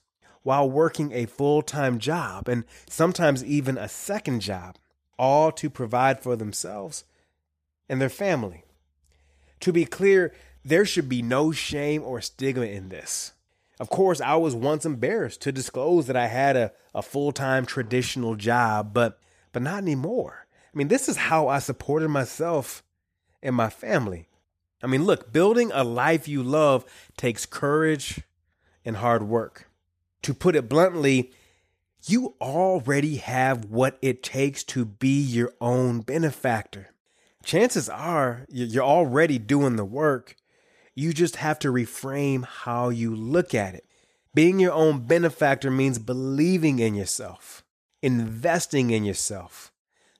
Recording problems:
none

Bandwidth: 14.5 kHz